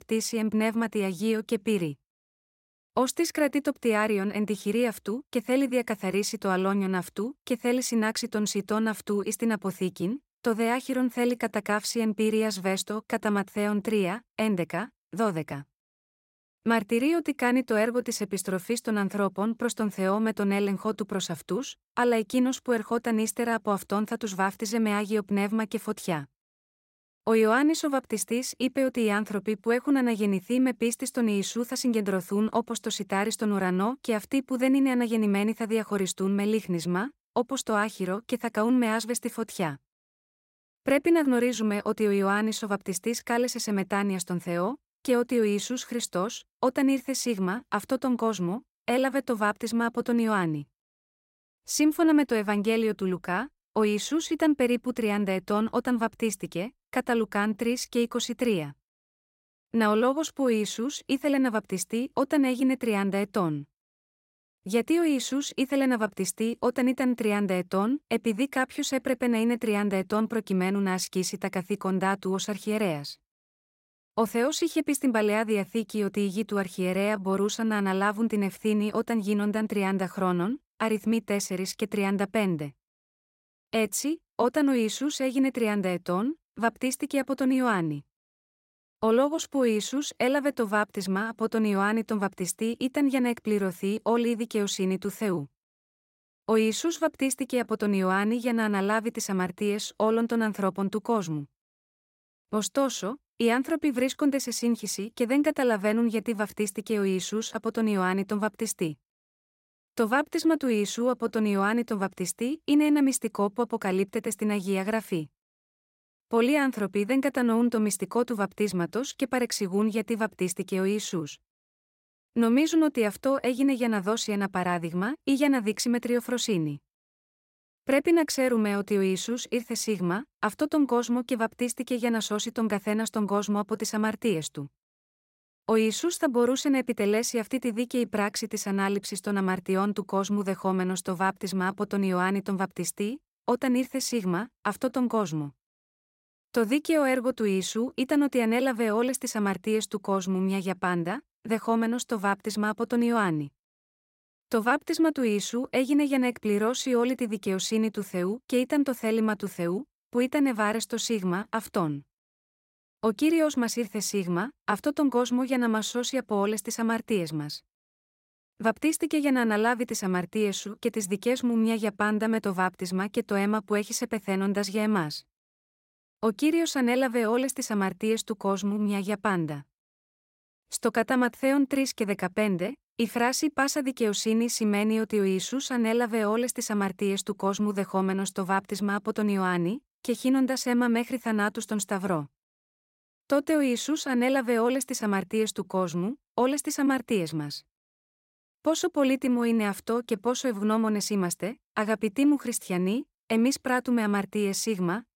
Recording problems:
none

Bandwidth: 16 kHz